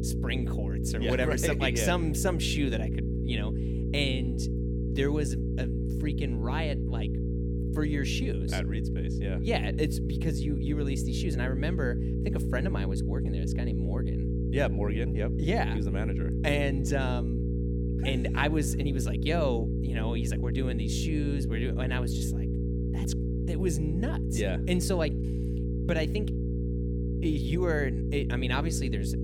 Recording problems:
electrical hum; loud; throughout; 60 Hz, 5 dB below the speech

